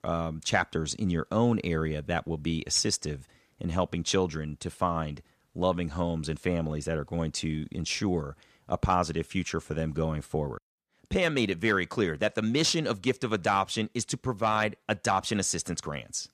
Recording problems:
none

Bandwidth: 14.5 kHz